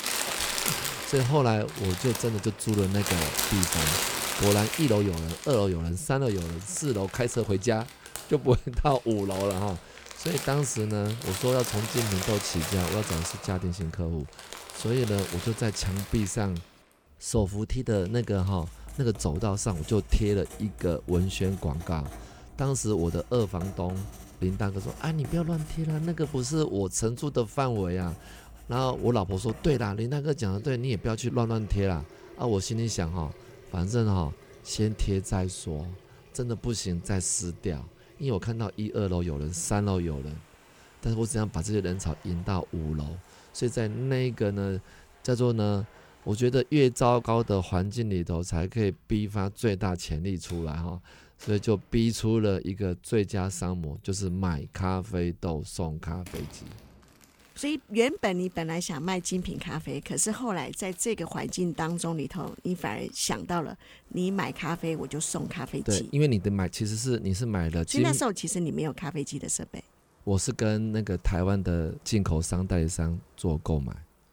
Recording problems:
household noises; loud; throughout; 6 dB below the speech

